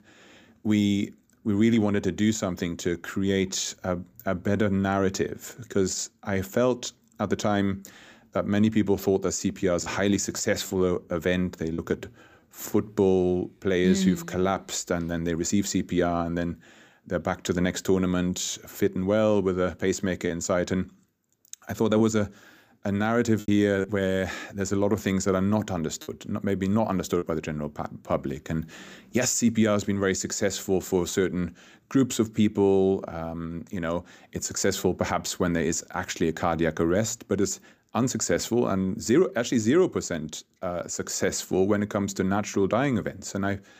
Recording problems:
choppy; occasionally; from 10 to 12 s, from 20 to 24 s and from 26 to 27 s; 4% of the speech affected

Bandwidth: 15 kHz